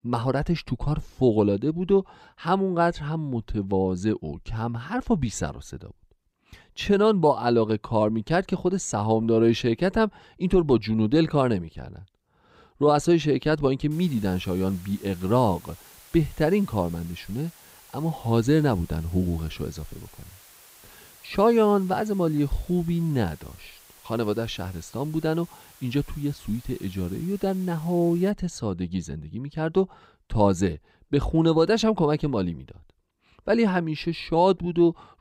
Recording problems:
hiss; faint; from 14 to 28 s; 25 dB below the speech

